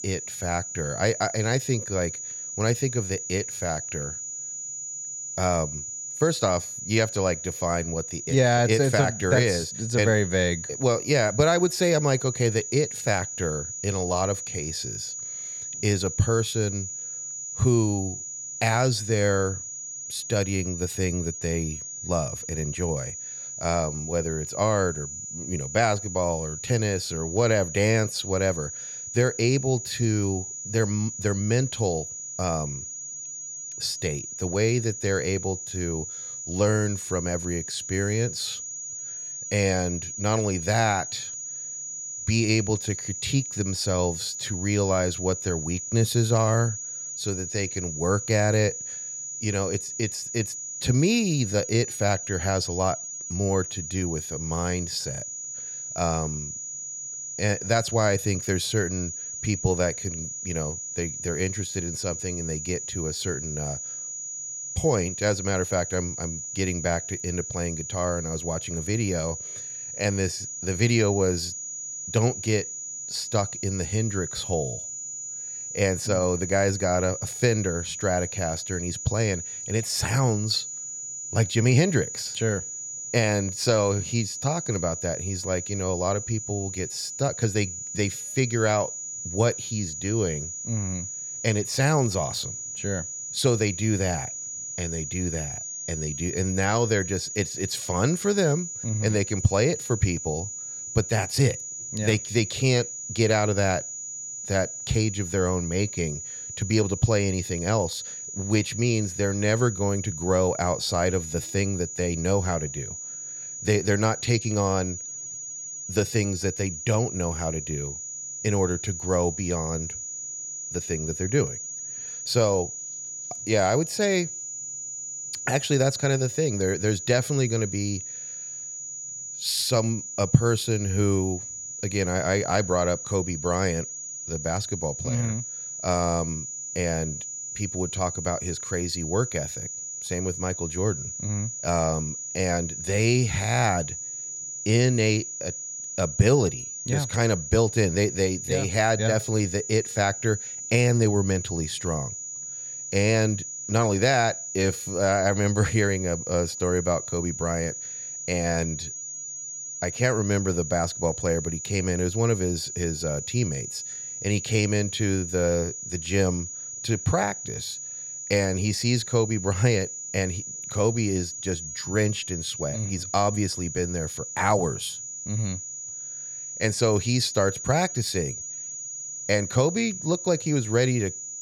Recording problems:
high-pitched whine; loud; throughout; 7 kHz, 6 dB below the speech

